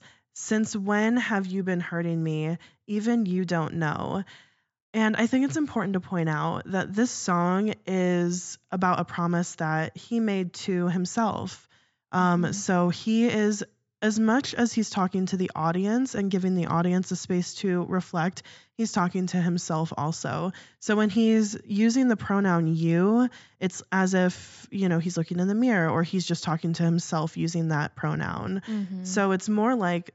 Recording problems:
high frequencies cut off; noticeable; nothing above 8 kHz

